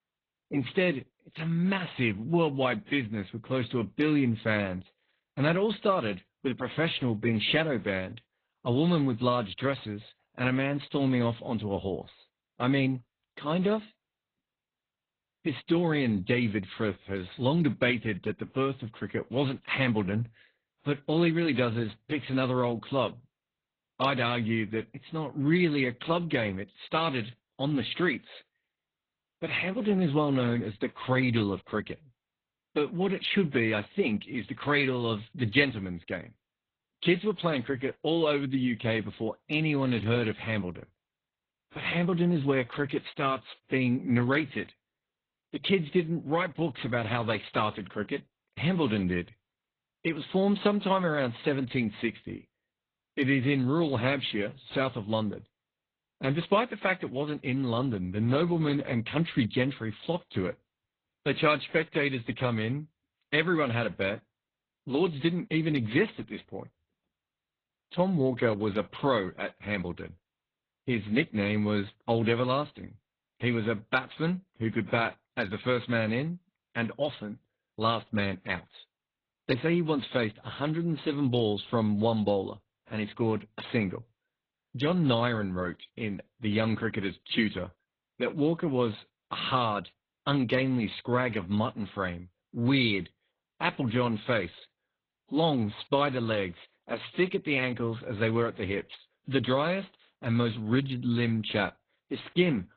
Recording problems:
garbled, watery; badly; nothing above 4 kHz

